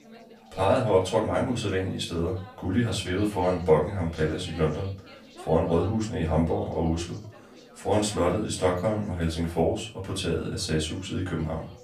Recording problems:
off-mic speech; far
room echo; slight; dies away in 0.3 s
background chatter; faint; throughout; 3 voices, 20 dB below the speech

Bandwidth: 15 kHz